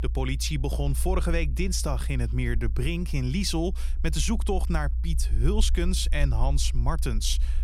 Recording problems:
low rumble; noticeable; throughout; 20 dB below the speech

